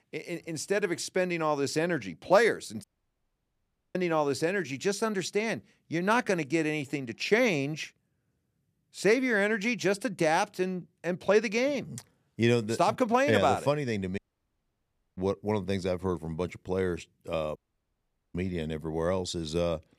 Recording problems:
audio cutting out; at 3 s for 1 s, at 14 s for 1 s and at 18 s for 1 s

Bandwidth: 14.5 kHz